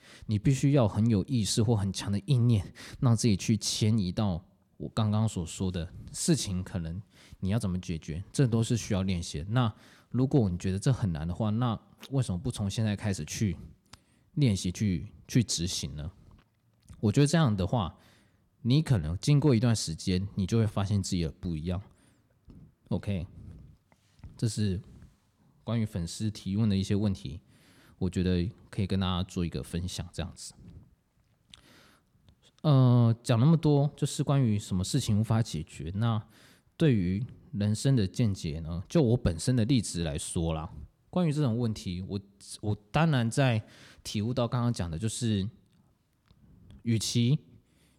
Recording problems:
none

